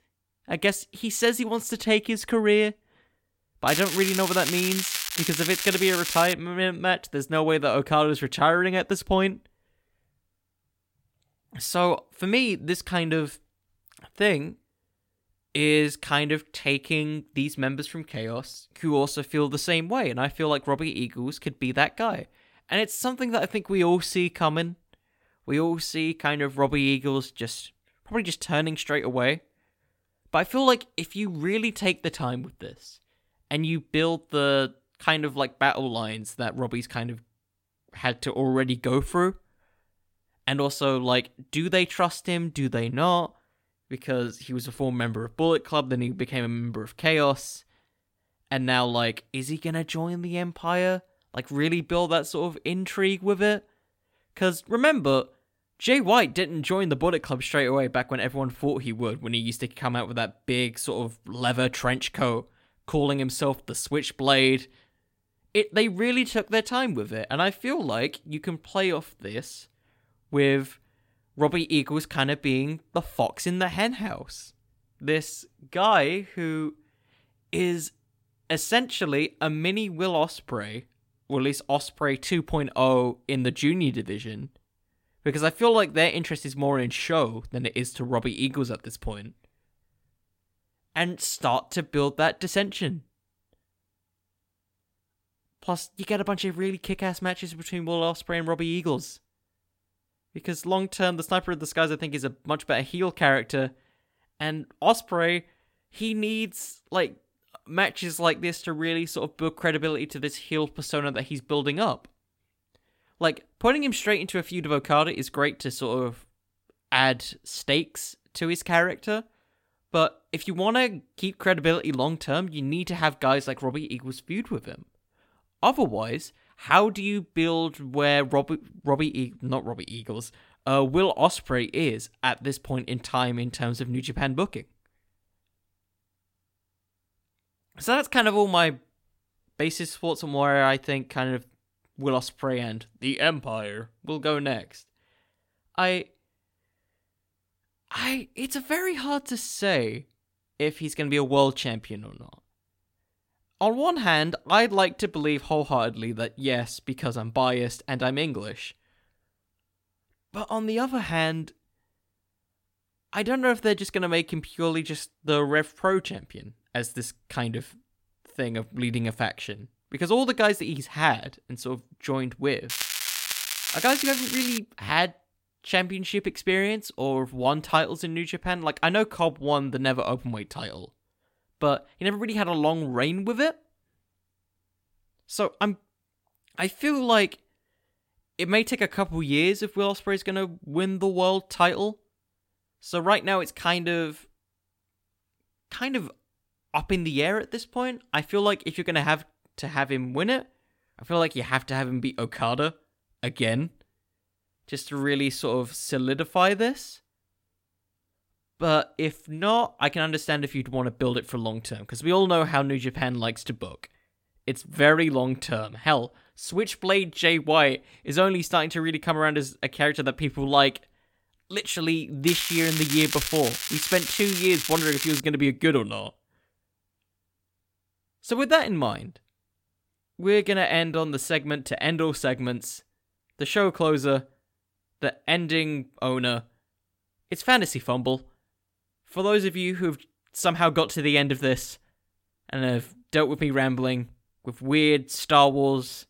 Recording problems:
crackling; loud; from 3.5 to 6.5 s, from 2:53 to 2:55 and from 3:42 to 3:45; 2 dB below the speech

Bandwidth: 16.5 kHz